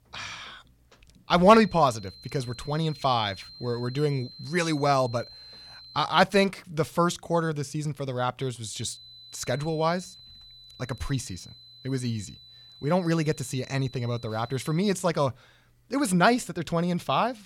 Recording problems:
high-pitched whine; noticeable; from 1.5 to 6 s and from 8.5 to 15 s; 4 kHz, 20 dB below the speech

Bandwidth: 18 kHz